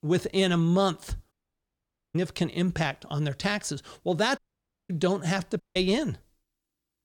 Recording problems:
audio cutting out; at 1.5 s for 1 s, at 4.5 s for 0.5 s and at 5.5 s

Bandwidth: 17.5 kHz